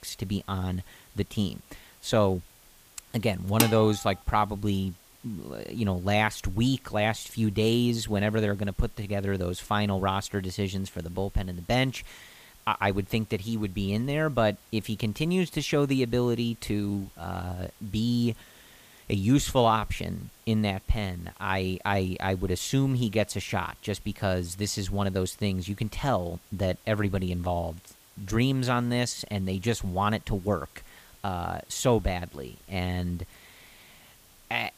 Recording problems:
hiss; faint; throughout; 25 dB below the speech
clattering dishes; loud; at 3.5 s; peak 1 dB above the speech

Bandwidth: 15 kHz